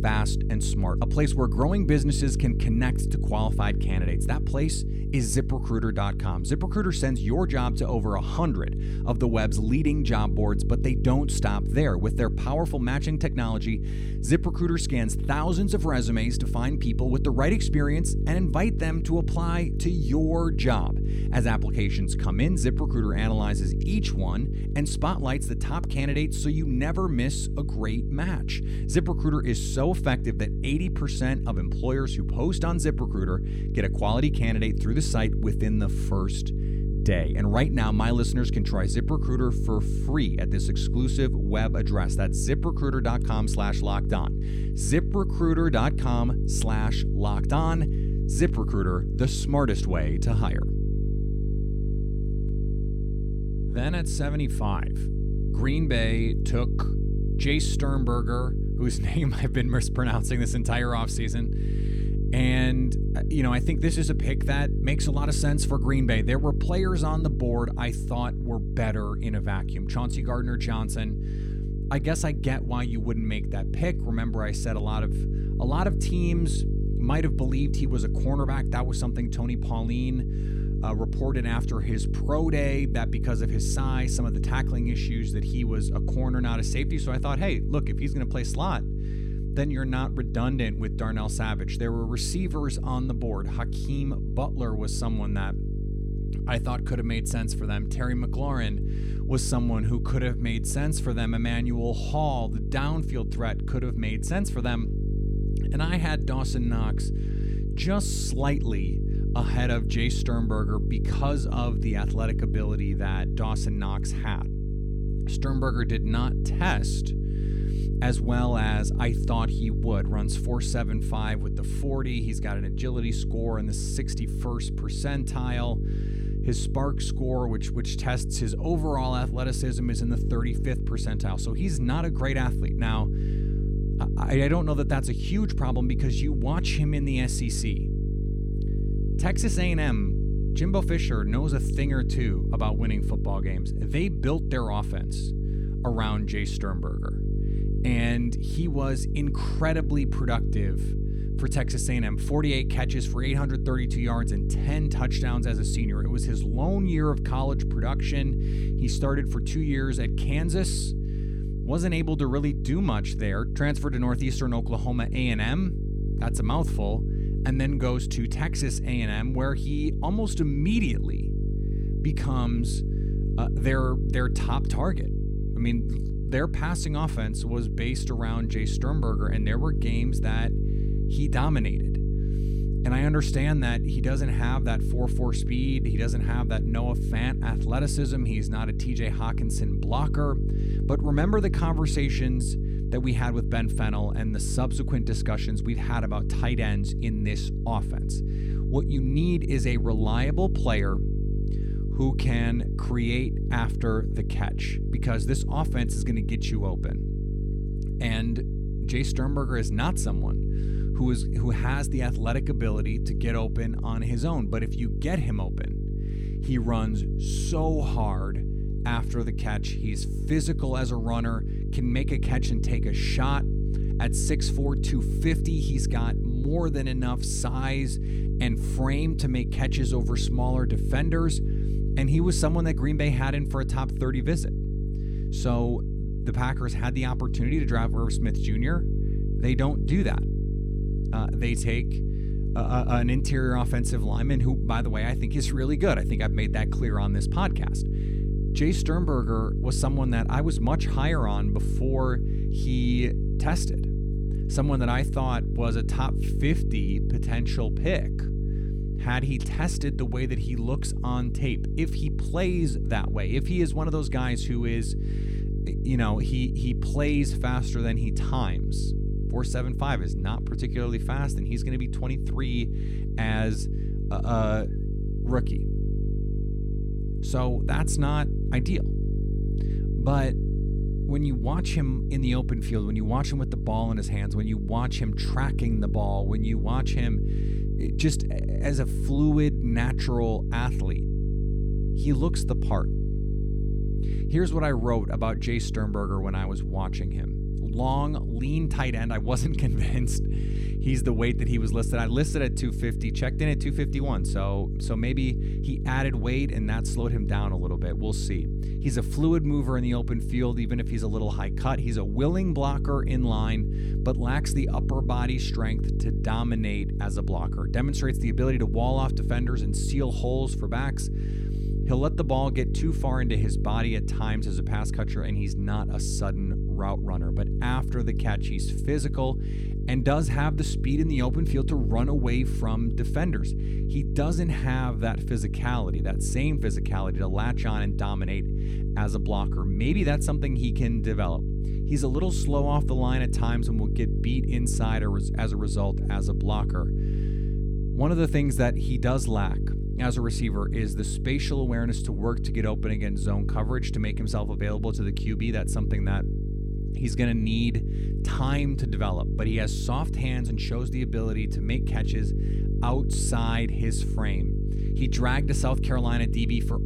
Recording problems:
electrical hum; loud; throughout; 50 Hz, 8 dB below the speech

